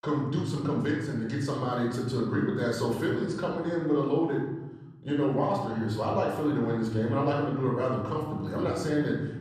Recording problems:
off-mic speech; far
room echo; noticeable; dies away in 1.3 s

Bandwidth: 13.5 kHz